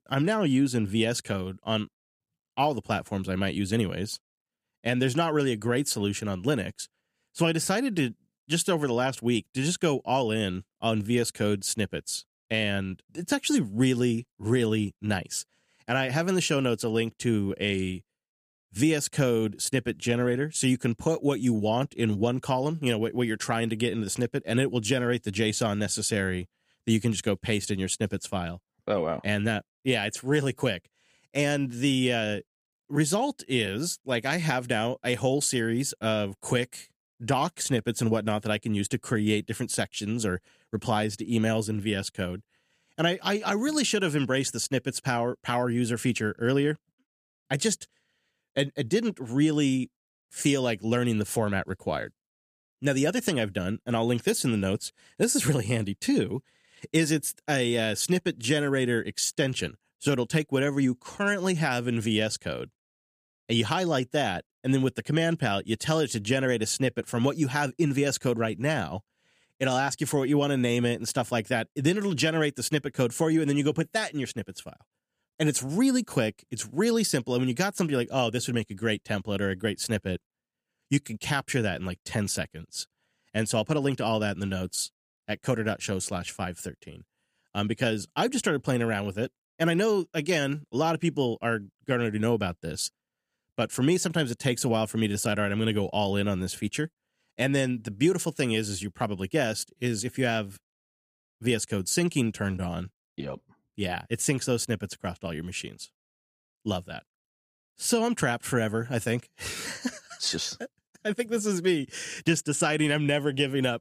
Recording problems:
none

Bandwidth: 15 kHz